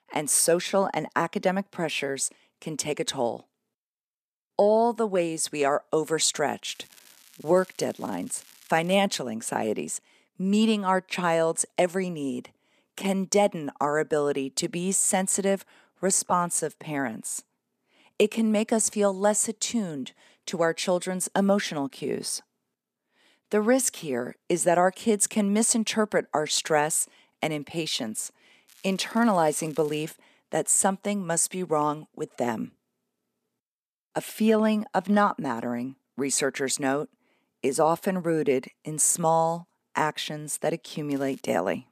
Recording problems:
crackling; faint; from 6.5 to 9 s, from 29 to 30 s and at 41 s; 25 dB below the speech

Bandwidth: 14.5 kHz